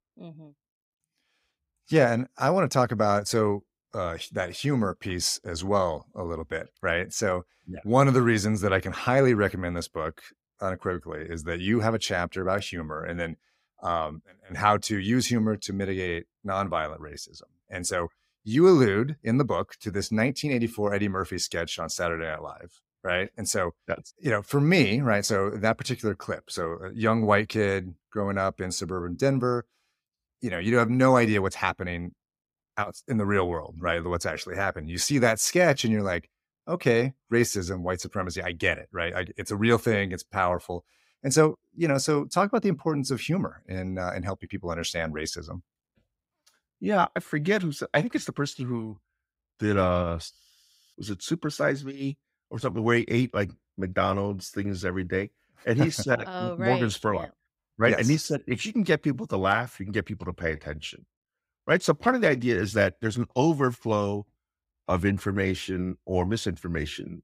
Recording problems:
none

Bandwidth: 15.5 kHz